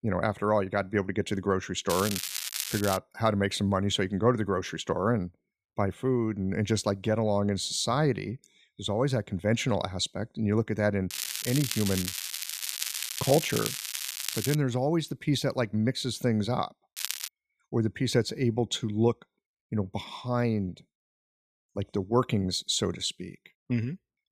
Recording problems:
crackling; loud; from 2 to 3 s, from 11 to 15 s and at 17 s; 4 dB below the speech

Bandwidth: 14.5 kHz